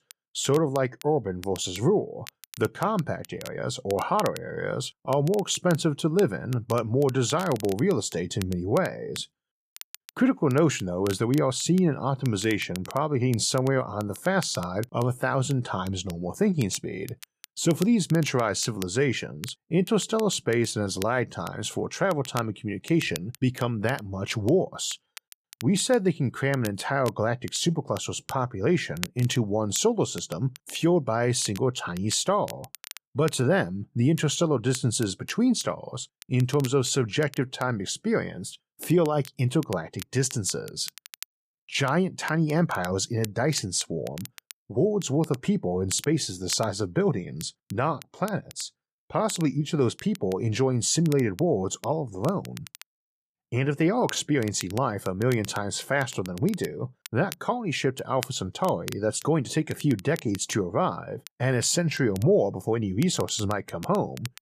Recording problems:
crackle, like an old record; noticeable; 20 dB below the speech

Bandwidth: 14.5 kHz